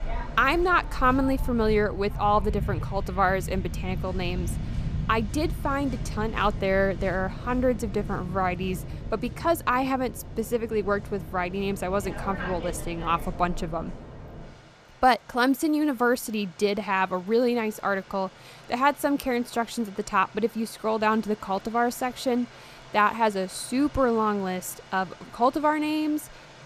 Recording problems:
rain or running water; noticeable; throughout; 10 dB below the speech

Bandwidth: 14.5 kHz